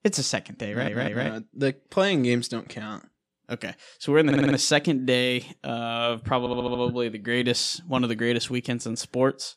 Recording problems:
audio stuttering; at 0.5 s, at 4.5 s and at 6.5 s

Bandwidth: 15 kHz